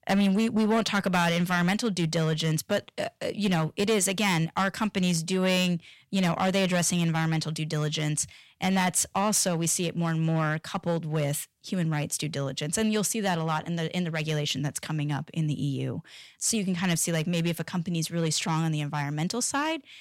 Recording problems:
distortion; slight; 5% of the sound clipped

